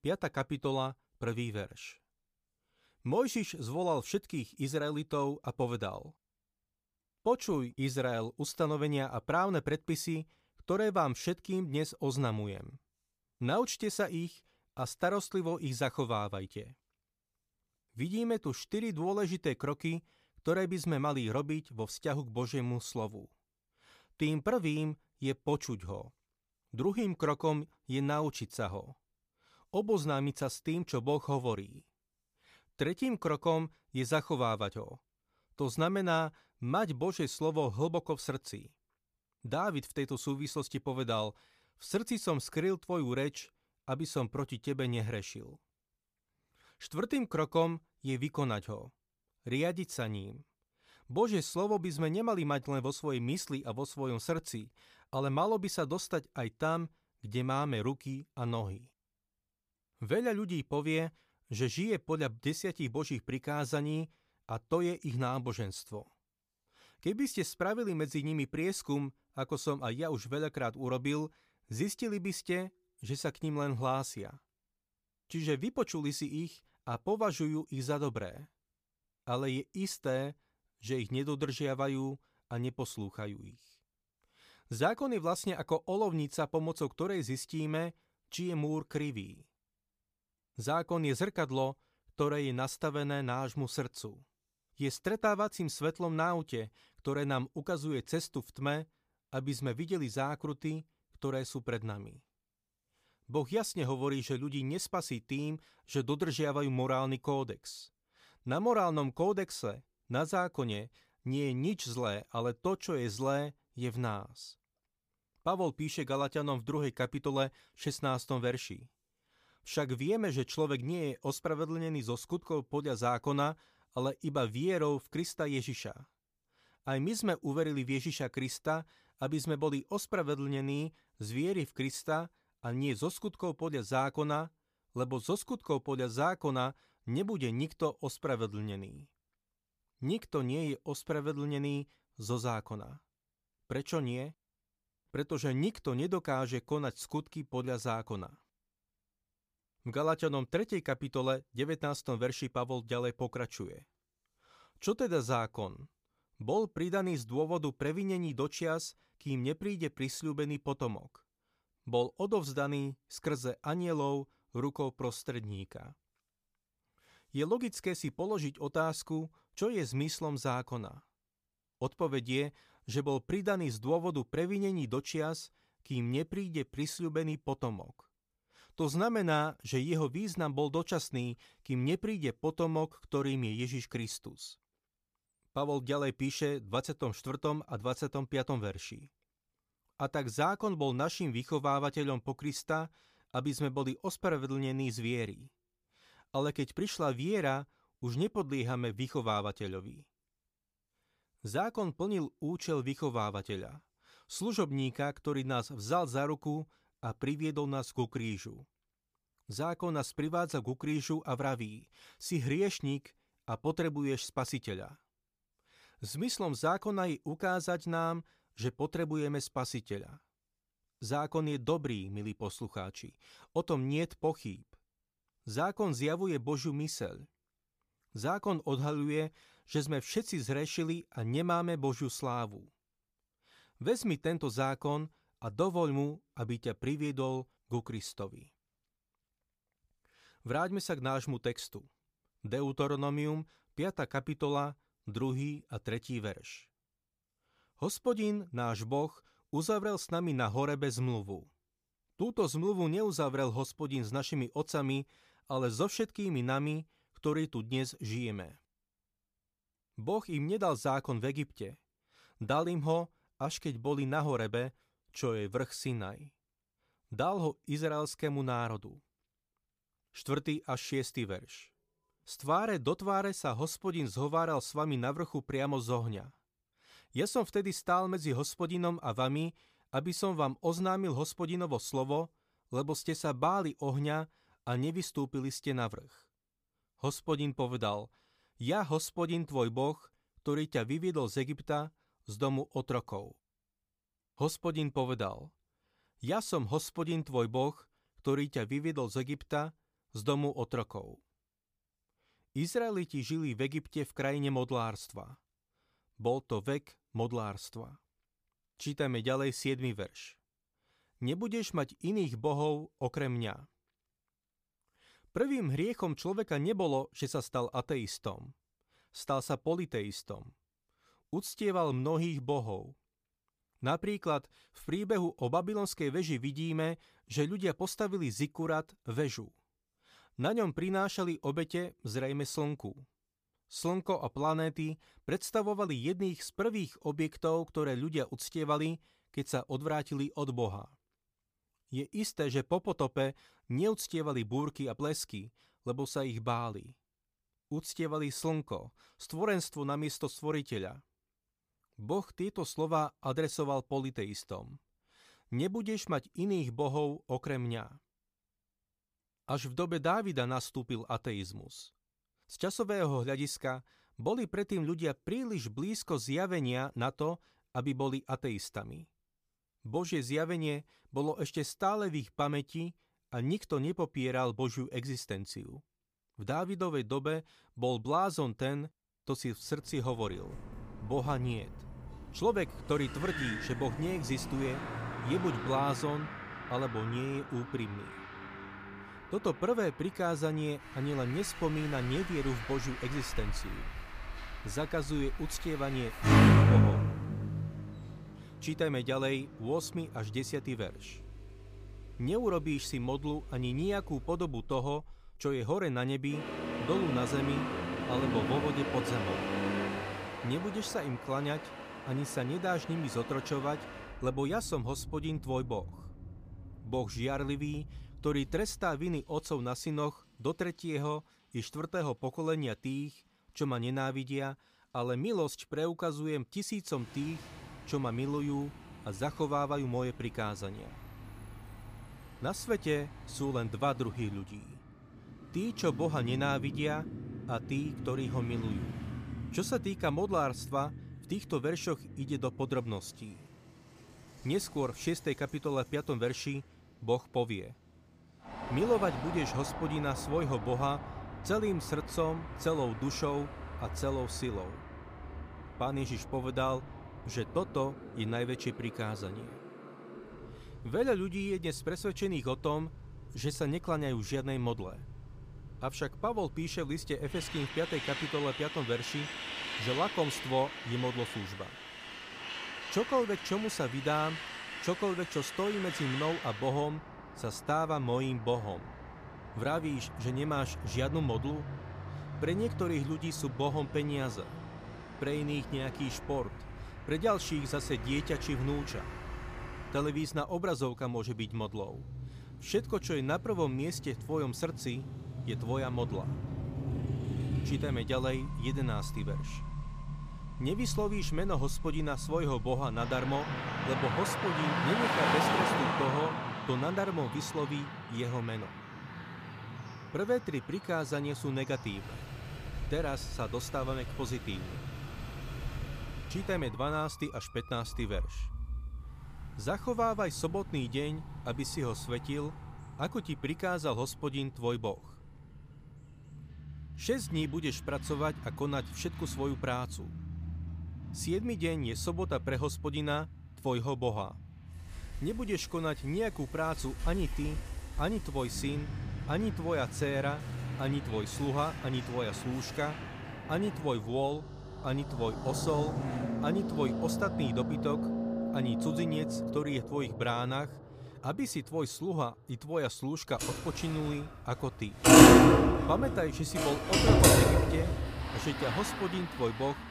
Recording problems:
traffic noise; very loud; from 6:20 on; as loud as the speech

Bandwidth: 15 kHz